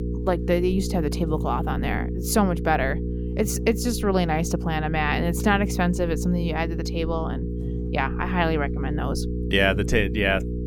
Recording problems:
electrical hum; noticeable; throughout; 60 Hz, 10 dB below the speech

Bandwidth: 17.5 kHz